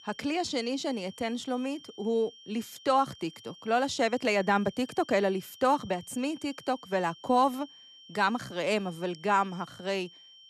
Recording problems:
high-pitched whine; faint; throughout; 3 kHz, 20 dB below the speech

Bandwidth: 13.5 kHz